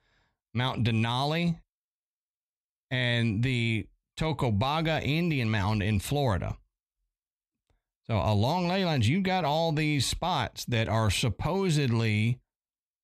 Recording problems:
none

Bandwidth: 14 kHz